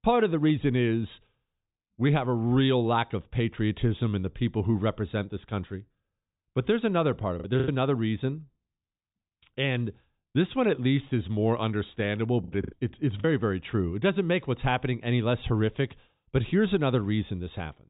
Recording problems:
high frequencies cut off; severe; nothing above 4 kHz
choppy; very; at 7.5 s and at 12 s; 13% of the speech affected

